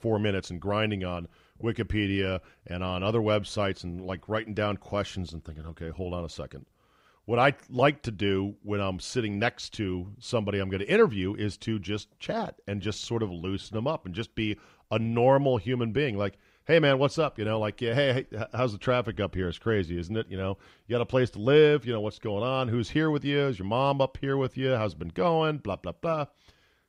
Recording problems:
none

